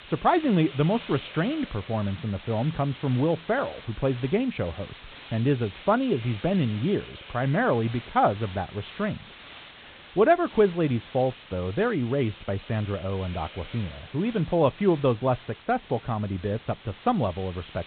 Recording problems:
high frequencies cut off; severe; nothing above 4 kHz
hiss; noticeable; throughout; 15 dB below the speech

